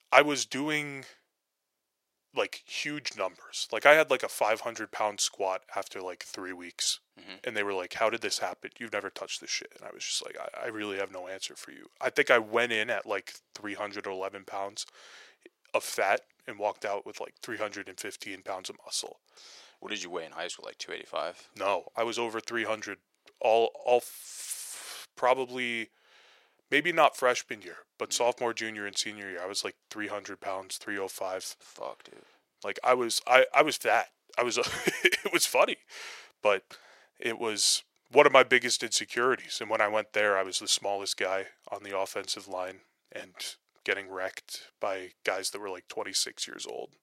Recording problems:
thin; very; fading below 600 Hz

